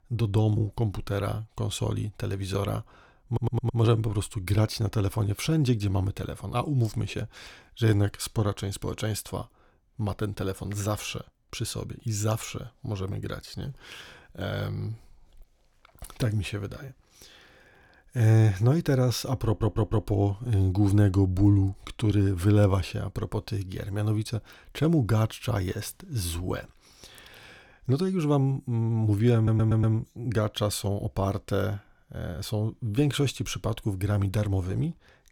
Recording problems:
audio stuttering; at 3.5 s, at 19 s and at 29 s

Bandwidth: 18.5 kHz